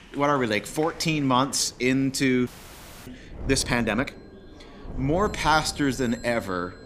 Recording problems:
wind noise on the microphone; occasional gusts; 25 dB below the speech
alarms or sirens; faint; from 2 s on; 25 dB below the speech
chatter from many people; faint; throughout; 25 dB below the speech
audio freezing; at 2.5 s for 0.5 s

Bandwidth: 15 kHz